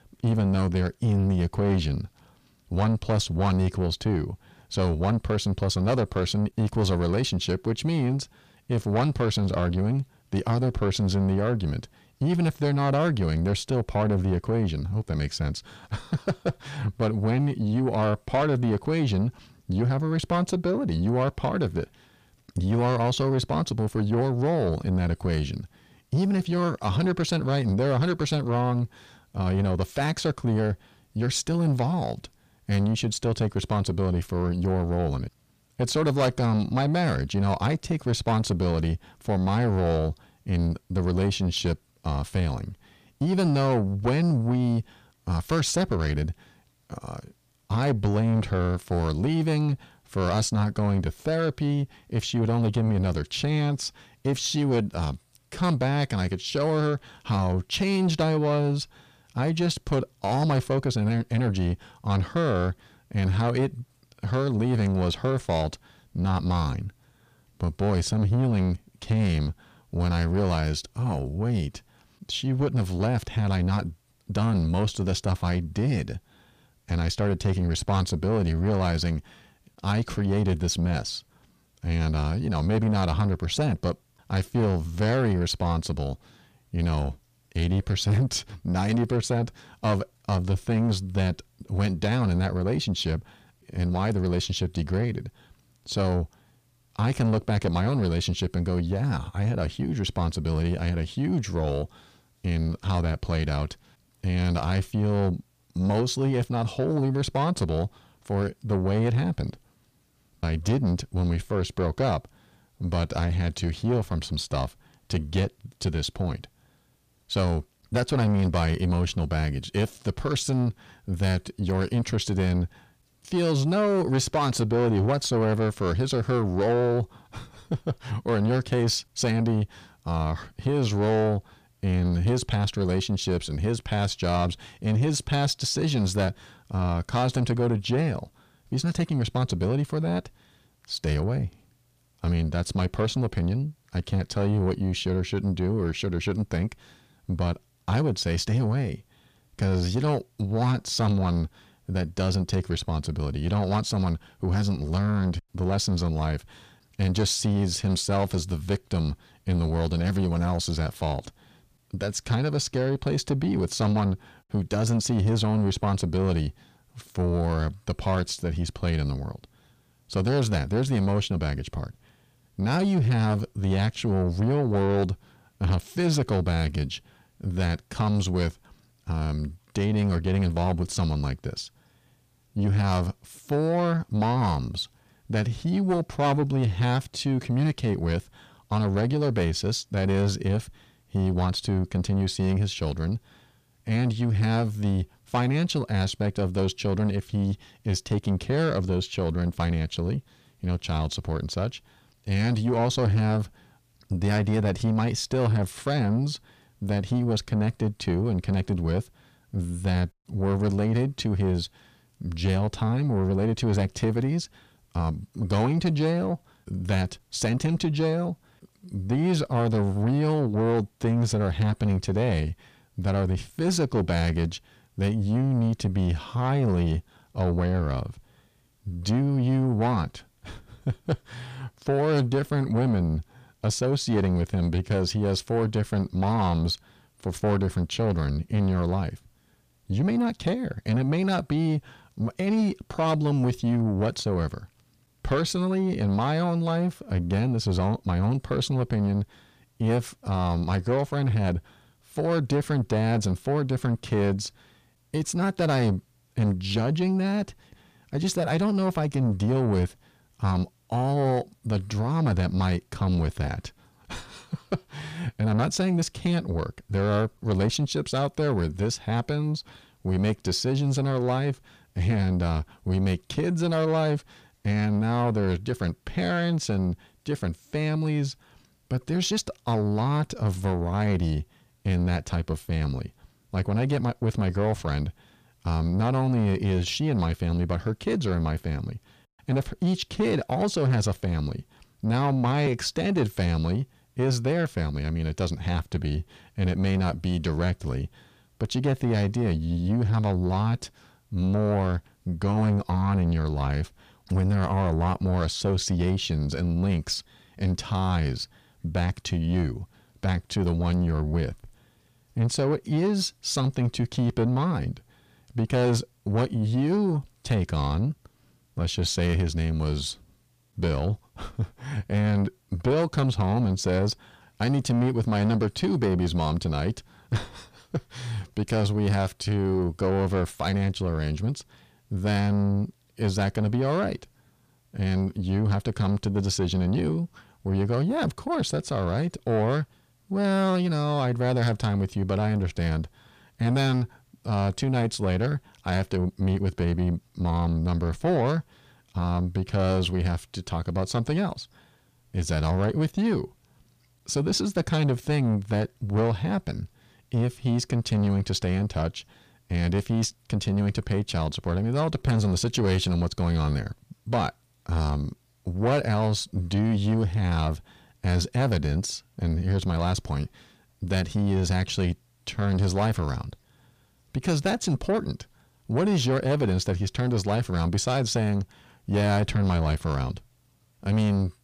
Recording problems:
distortion; slight; 10 dB below the speech

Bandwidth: 15 kHz